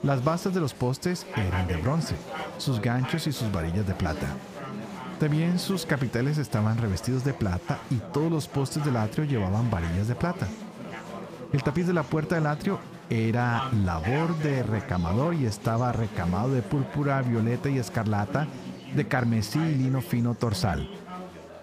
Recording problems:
chatter from many people; noticeable; throughout; 10 dB below the speech

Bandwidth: 15 kHz